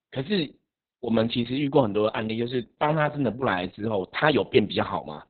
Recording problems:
garbled, watery; badly; nothing above 4 kHz

